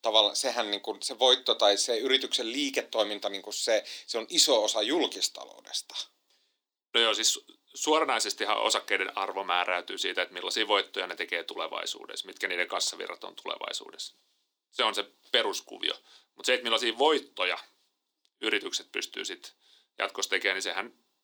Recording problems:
thin; somewhat; fading below 300 Hz

